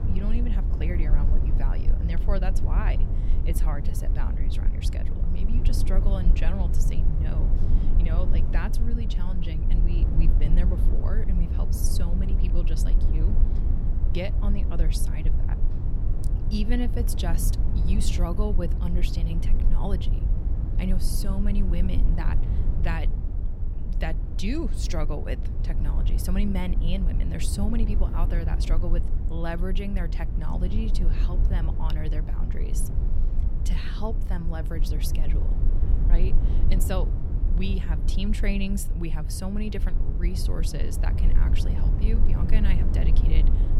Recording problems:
low rumble; loud; throughout; 5 dB below the speech

